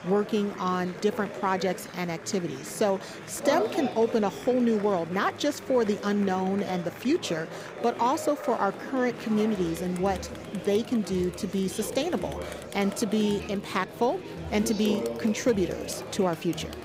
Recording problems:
murmuring crowd; loud; throughout; 9 dB below the speech

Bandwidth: 15.5 kHz